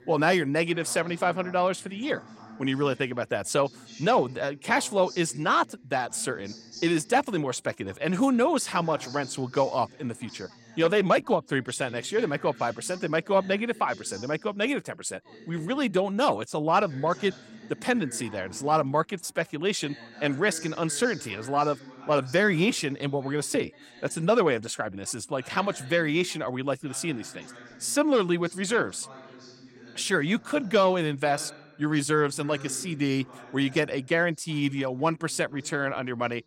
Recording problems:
background chatter; faint; throughout; 2 voices, 20 dB below the speech

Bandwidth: 16 kHz